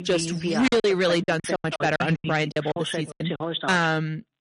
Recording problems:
distortion; slight; 7% of the sound clipped
garbled, watery; slightly; nothing above 10.5 kHz
voice in the background; loud; throughout; 7 dB below the speech
choppy; very; 14% of the speech affected

